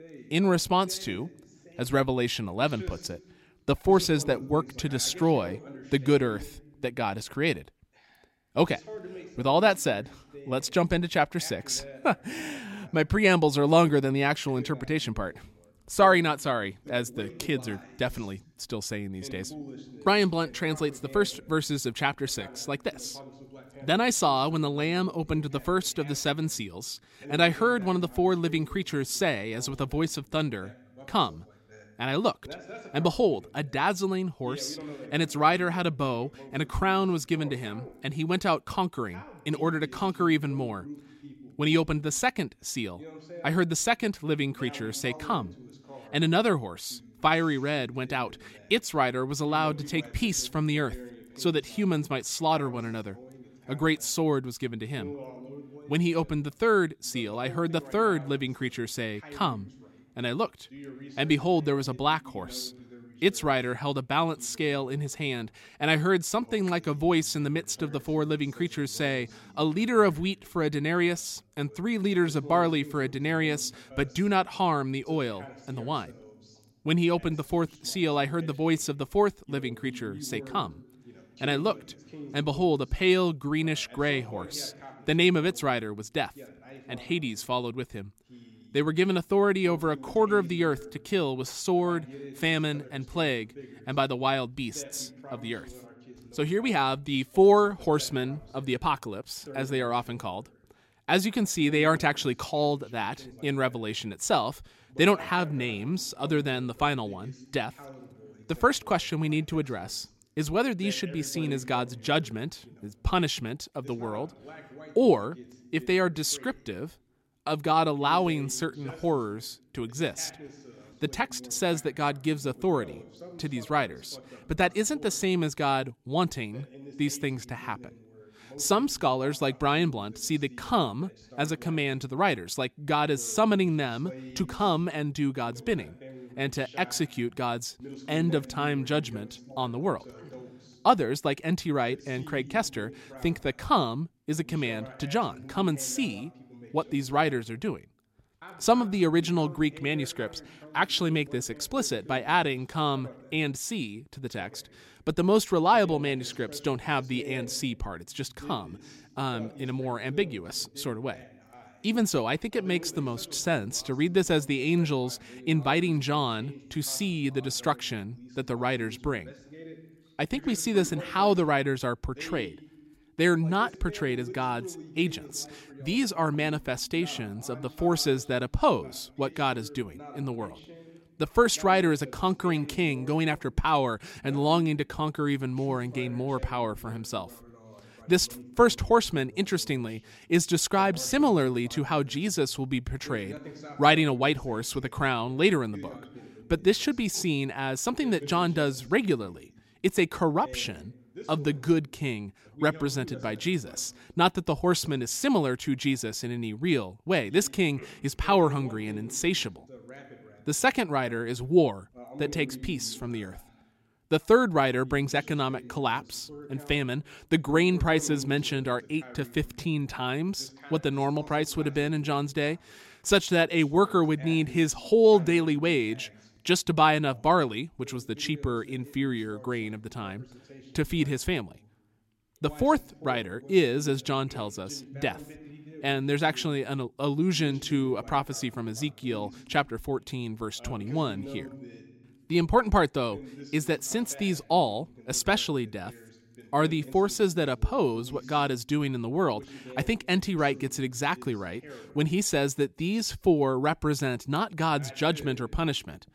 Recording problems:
voice in the background; noticeable; throughout; 20 dB below the speech

